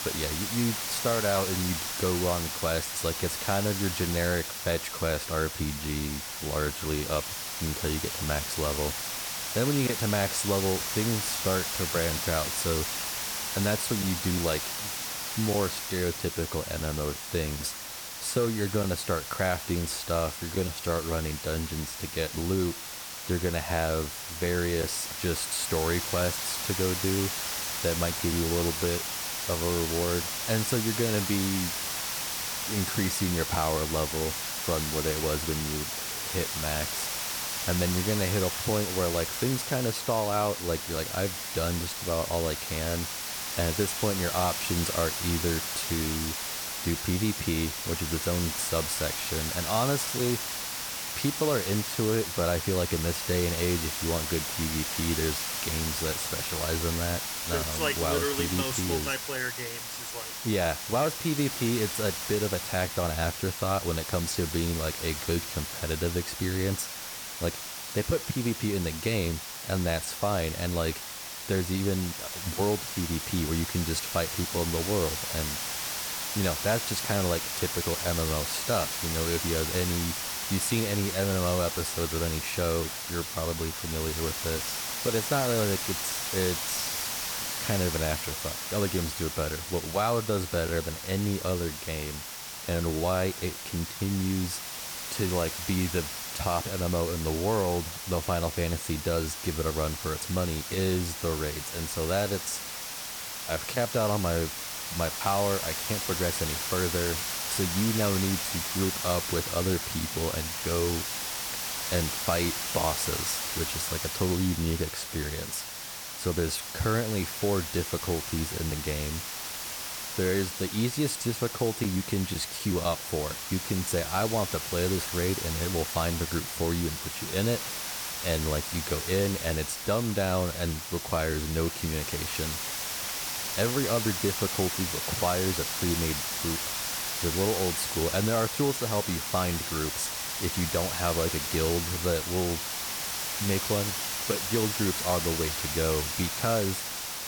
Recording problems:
hiss; loud; throughout; 1 dB below the speech

